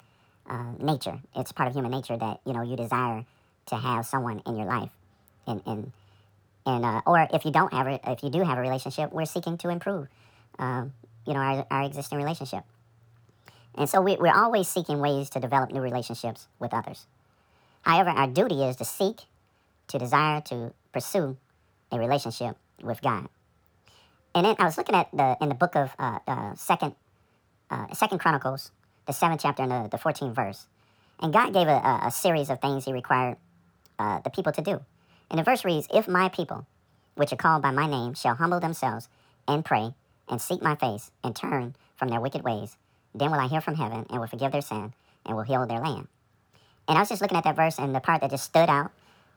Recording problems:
wrong speed and pitch; too fast and too high; 1.6 times normal speed

